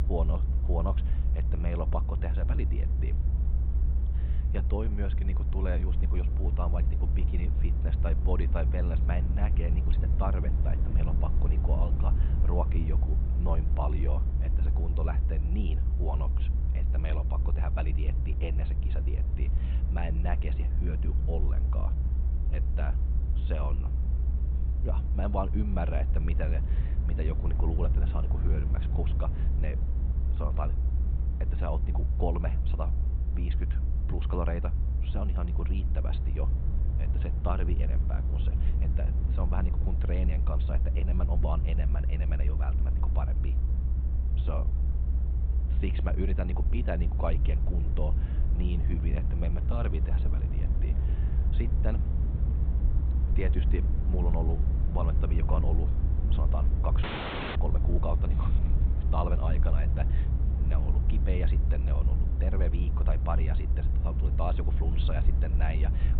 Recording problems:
high frequencies cut off; severe; nothing above 4 kHz
low rumble; loud; throughout; 6 dB below the speech
audio cutting out; at 57 s for 0.5 s

